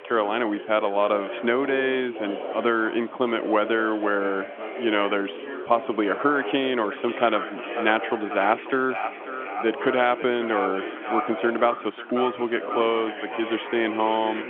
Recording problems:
echo of what is said; strong; from 7 s on; 540 ms later, 9 dB below the speech
phone-call audio; nothing above 3.5 kHz
background chatter; loud; throughout; 4 voices, 10 dB below the speech
hiss; faint; throughout; 25 dB below the speech

